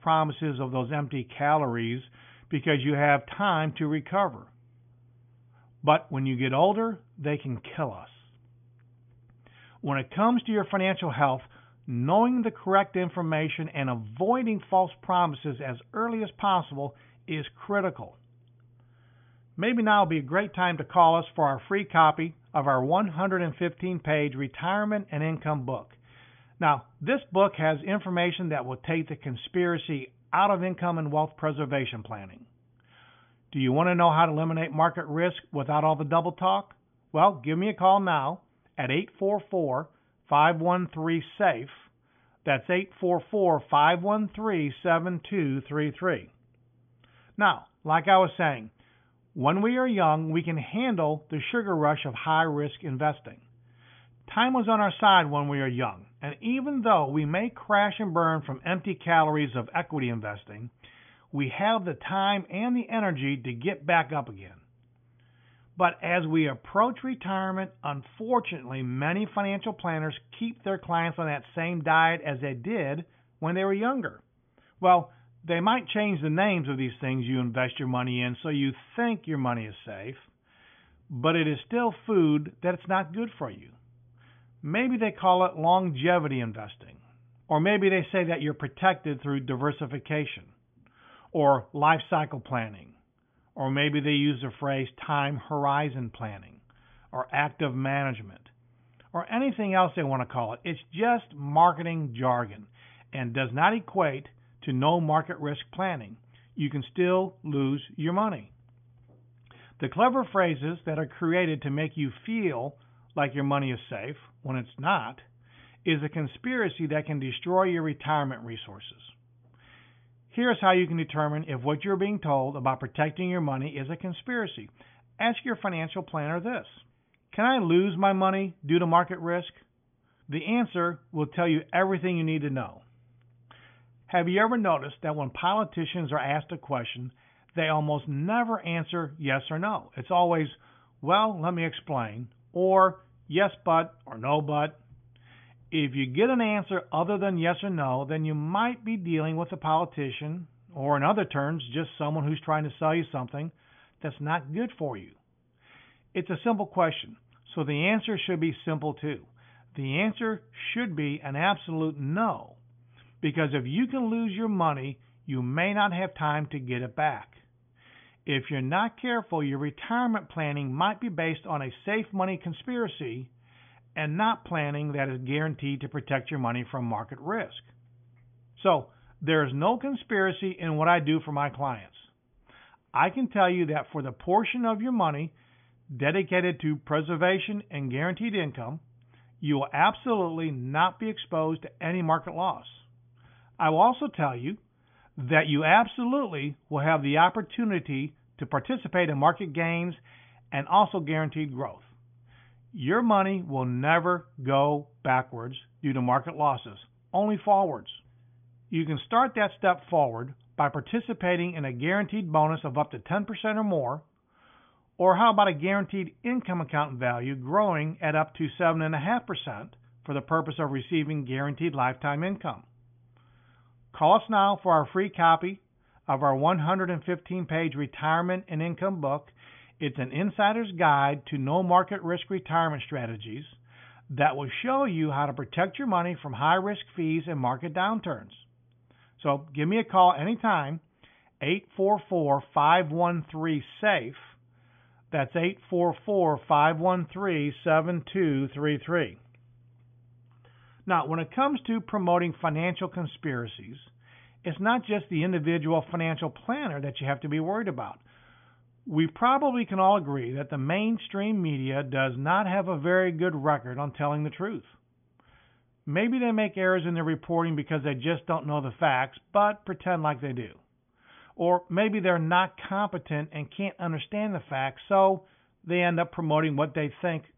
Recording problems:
high frequencies cut off; severe; nothing above 3.5 kHz

